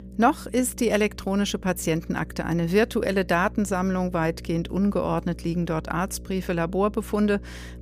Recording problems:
electrical hum; faint; throughout; 60 Hz, 25 dB below the speech
background music; faint; throughout; 30 dB below the speech

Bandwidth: 15 kHz